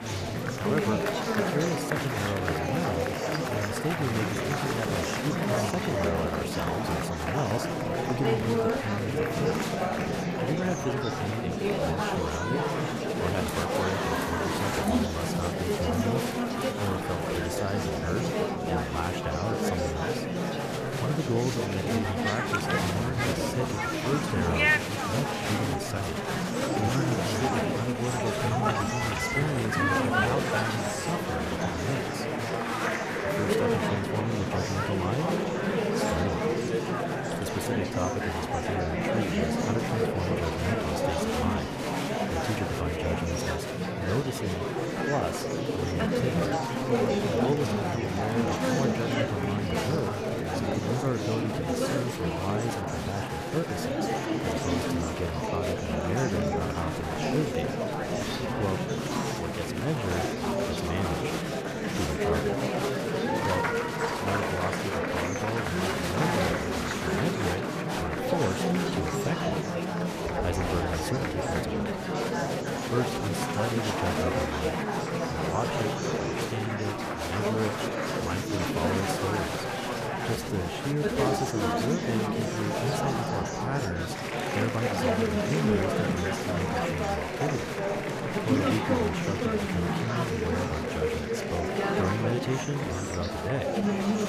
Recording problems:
murmuring crowd; very loud; throughout; 5 dB above the speech

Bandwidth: 14.5 kHz